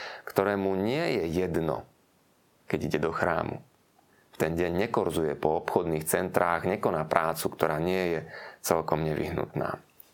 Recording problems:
squashed, flat; heavily

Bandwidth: 17 kHz